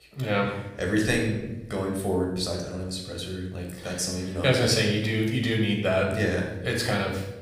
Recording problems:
room echo; noticeable; dies away in 1 s
off-mic speech; somewhat distant

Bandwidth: 15.5 kHz